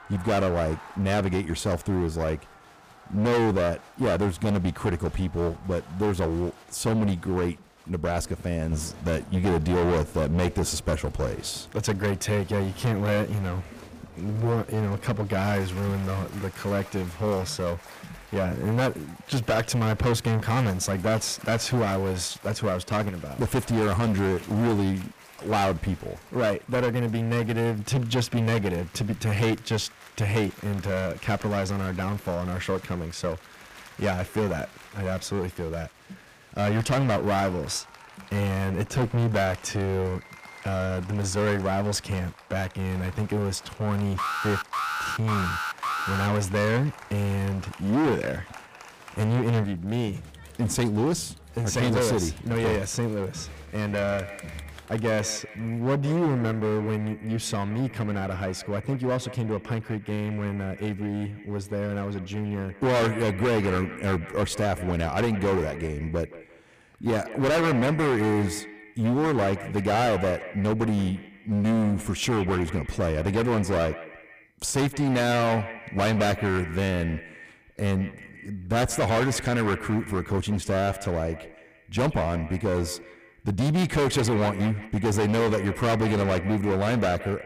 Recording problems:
distortion; heavy; 17% of the sound clipped
echo of what is said; noticeable; from 53 s on; 170 ms later, 15 dB below the speech
crowd noise; faint; until 55 s; 20 dB below the speech
alarm; noticeable; from 44 to 46 s; peak 1 dB below the speech

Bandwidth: 15 kHz